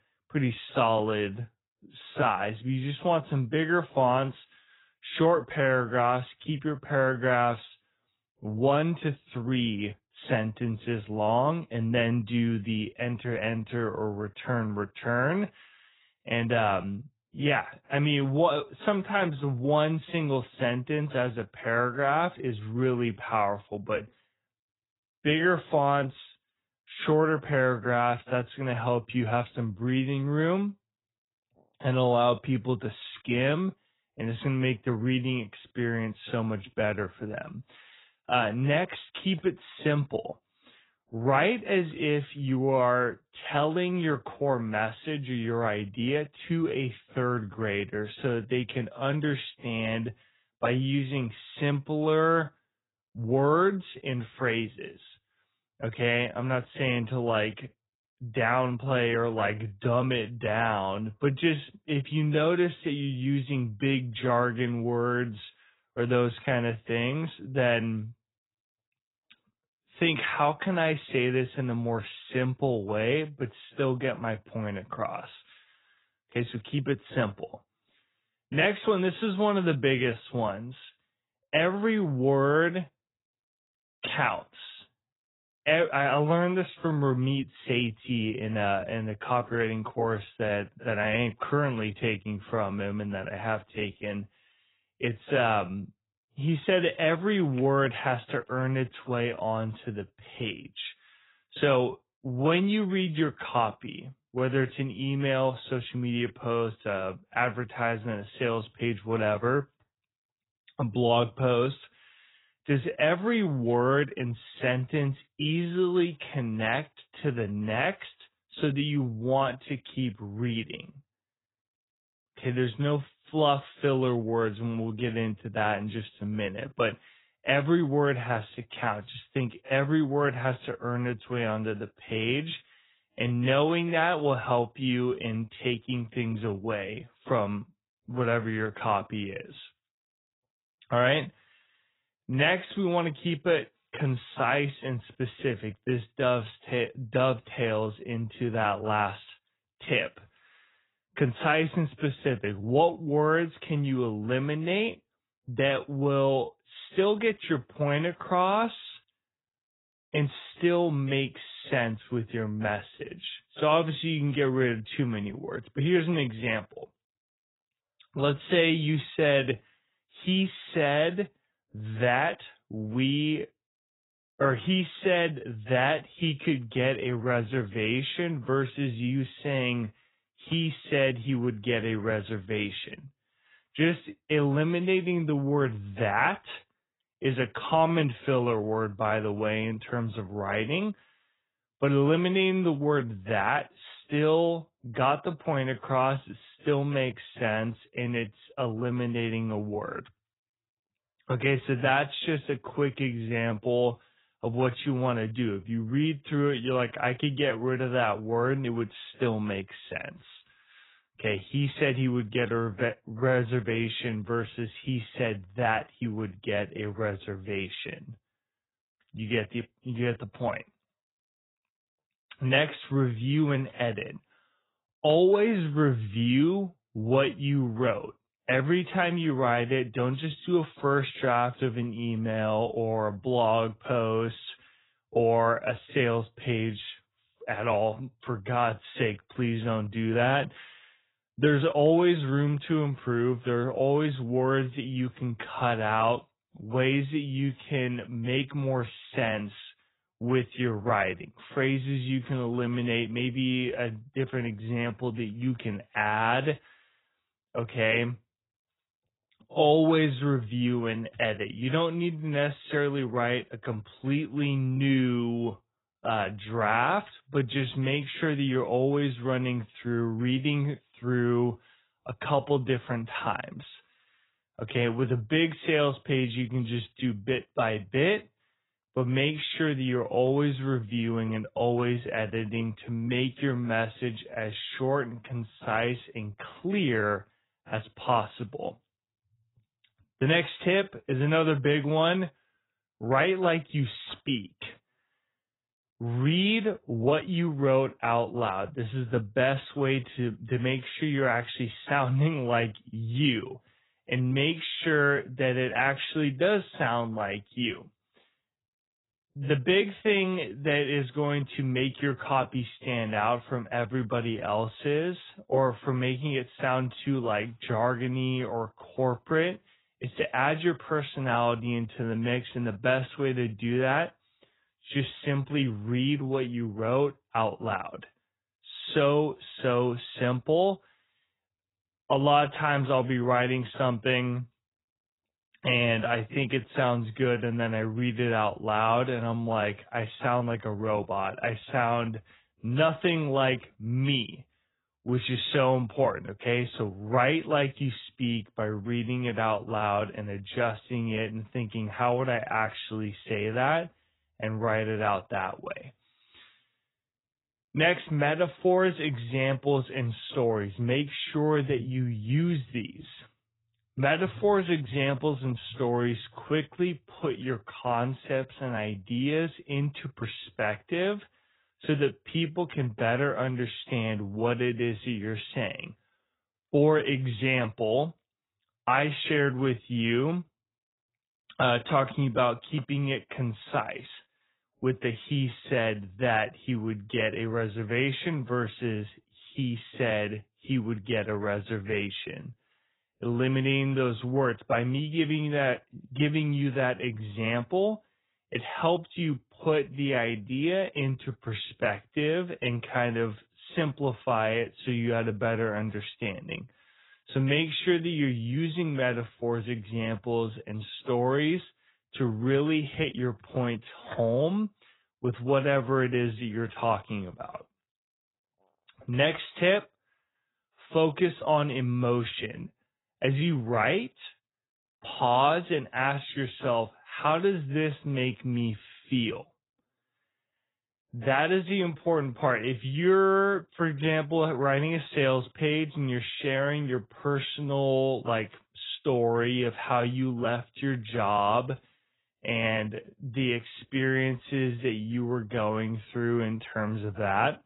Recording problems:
garbled, watery; badly; nothing above 4 kHz
wrong speed, natural pitch; too slow; 0.6 times normal speed

